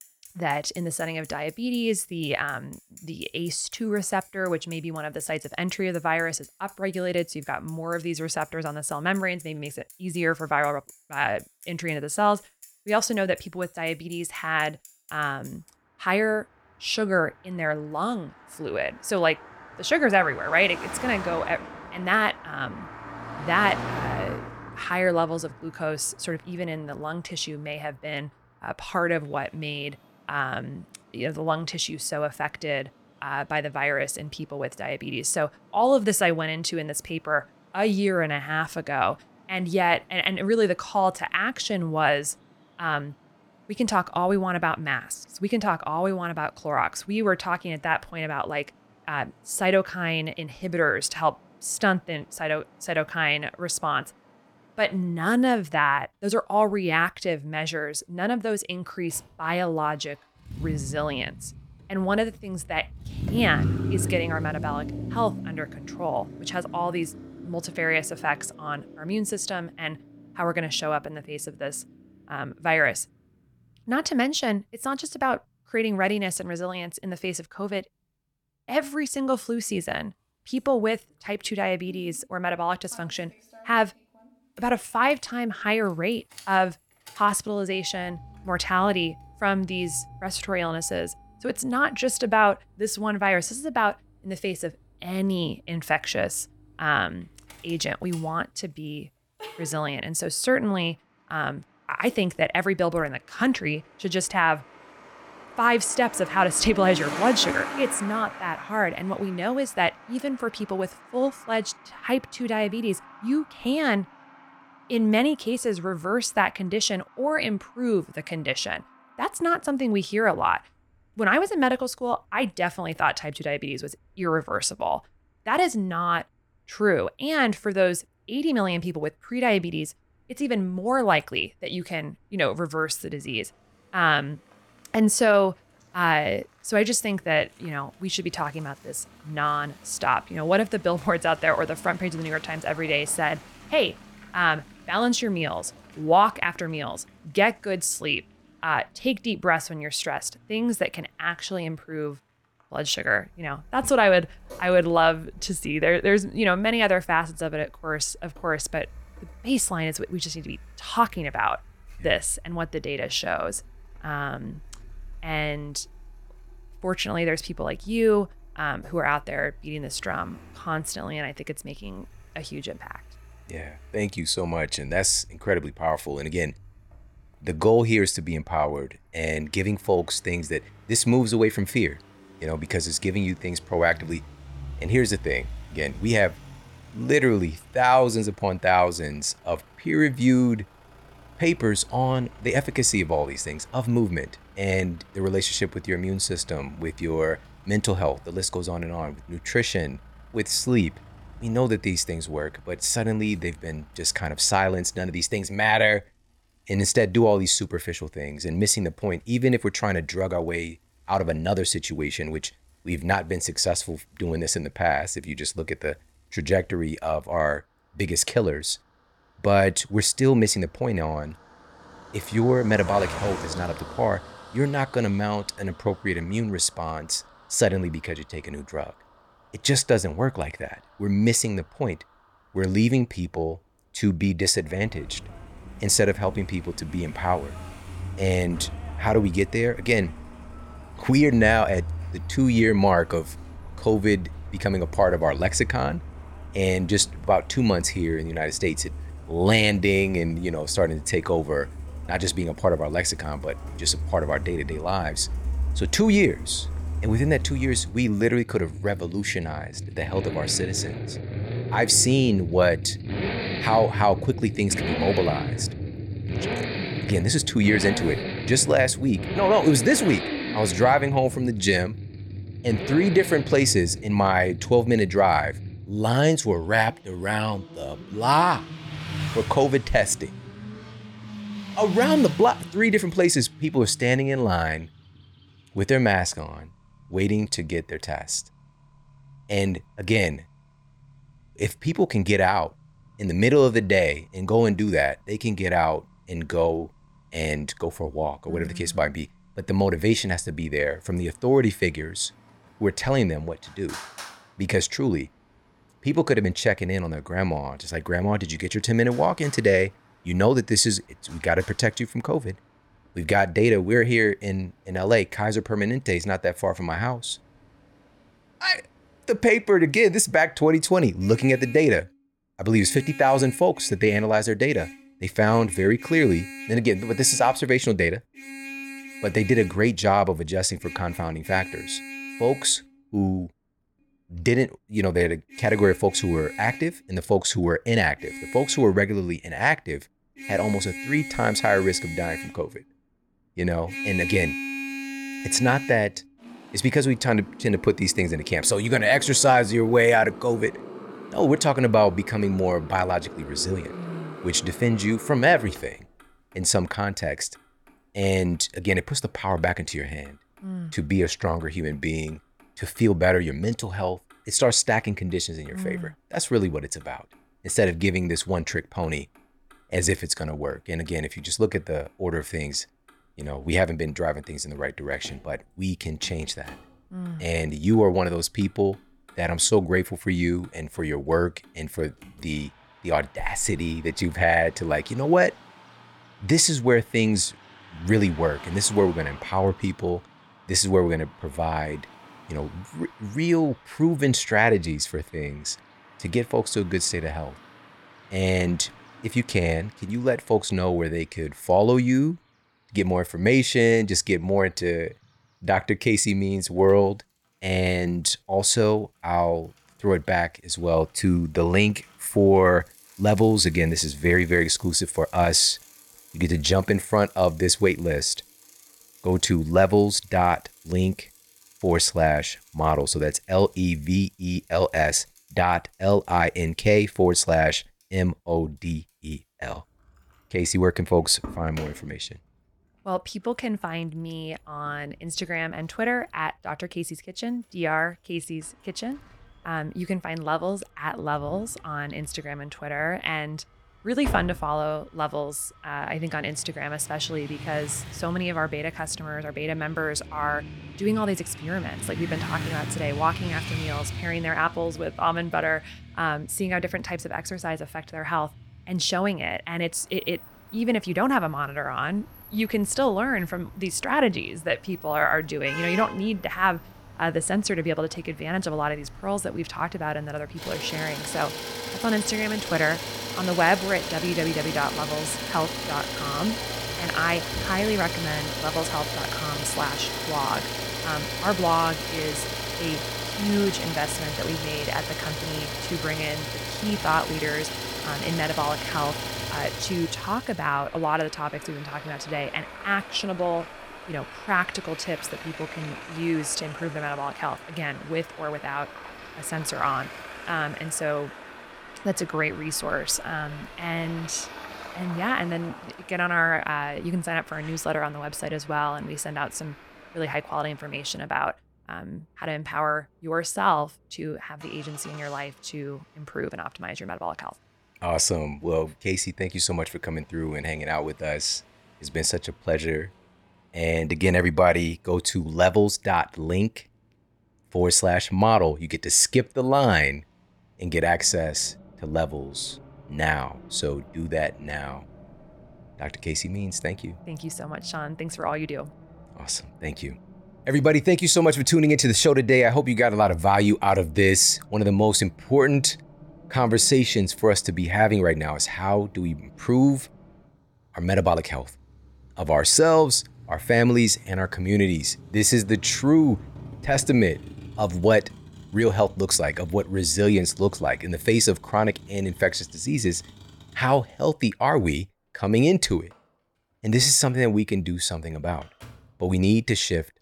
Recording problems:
traffic noise; noticeable; throughout; 10 dB below the speech

